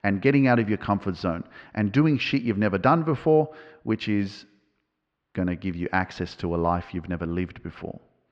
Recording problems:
muffled; slightly; fading above 3 kHz

